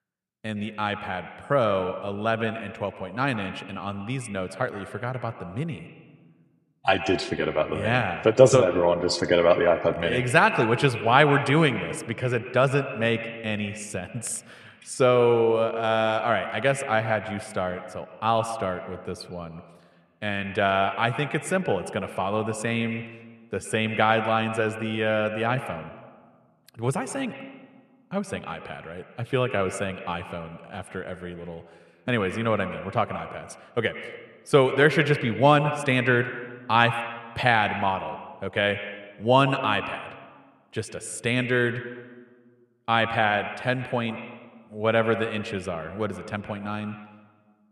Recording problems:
echo of what is said; strong; throughout; 110 ms later, 10 dB below the speech

